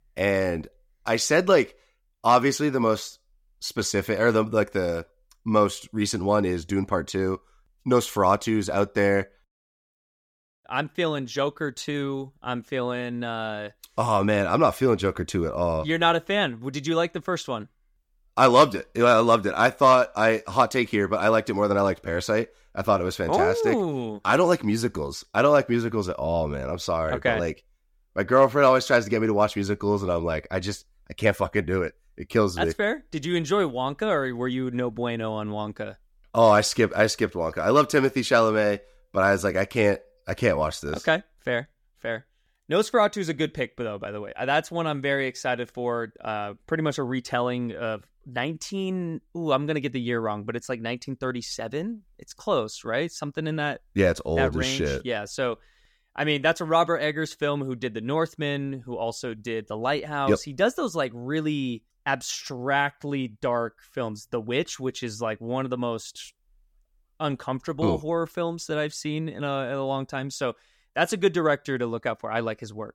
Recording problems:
none

